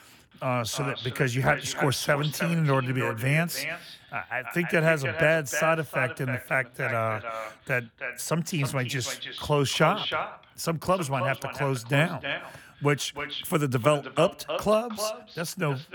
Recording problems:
echo of what is said; strong; throughout; 310 ms later, 8 dB below the speech

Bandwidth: 18.5 kHz